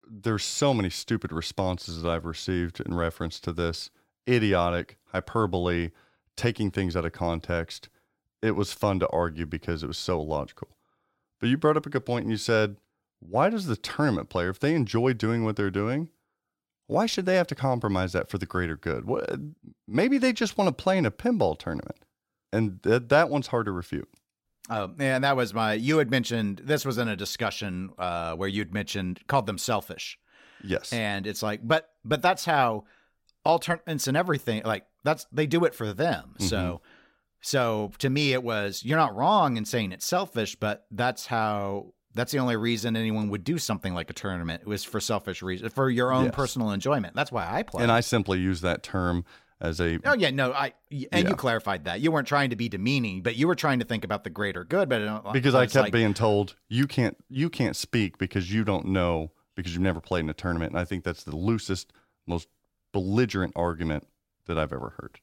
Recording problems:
none

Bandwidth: 16.5 kHz